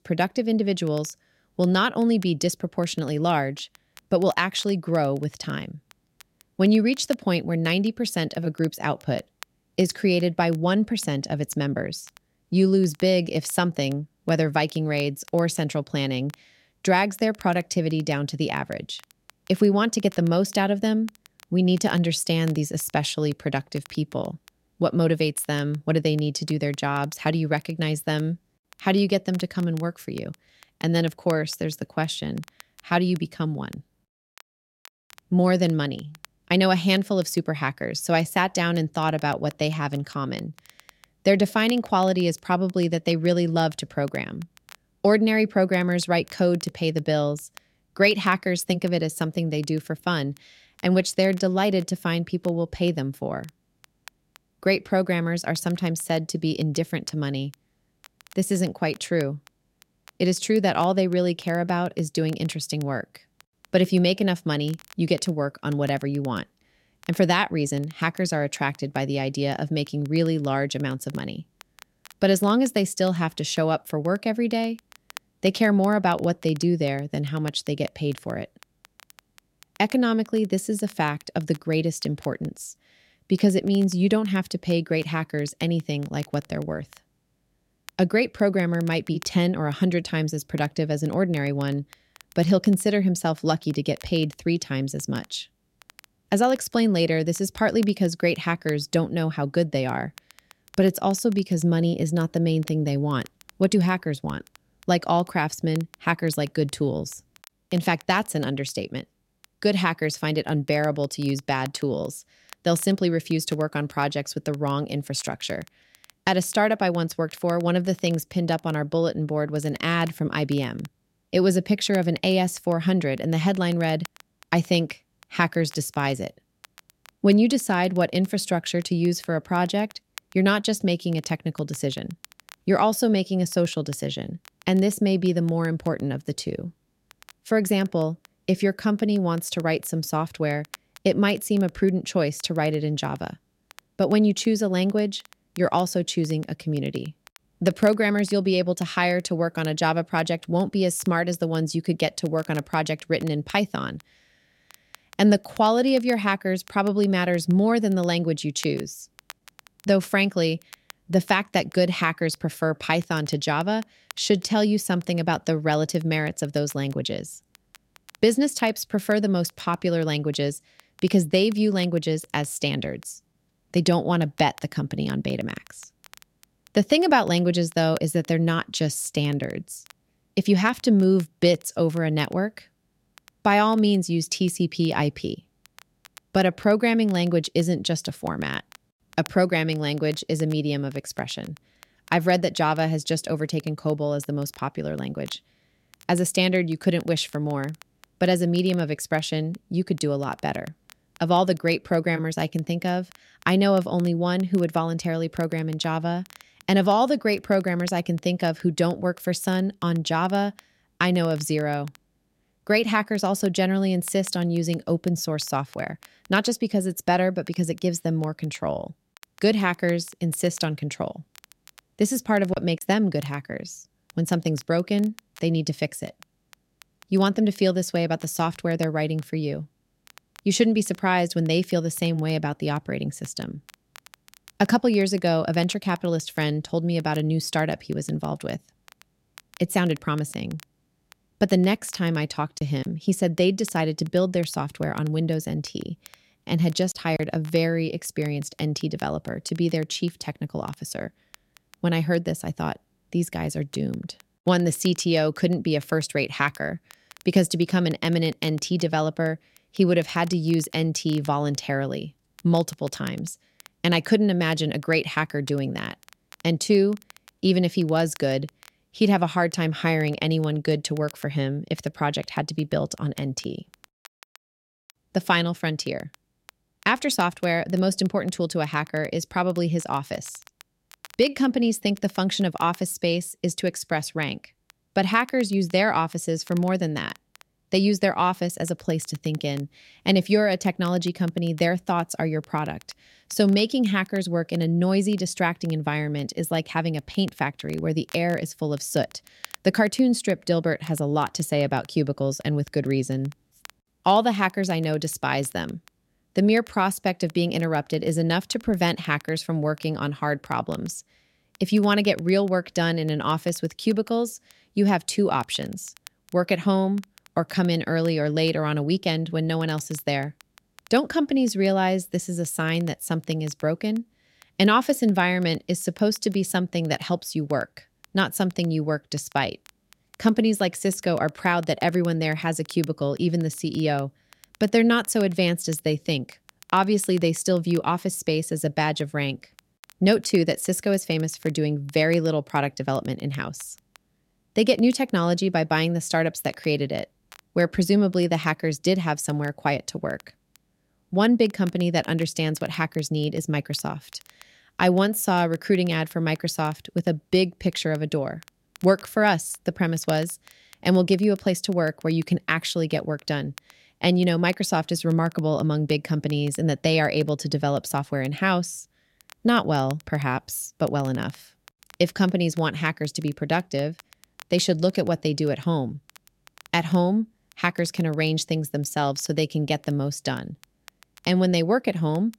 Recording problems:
crackle, like an old record; faint; 25 dB below the speech

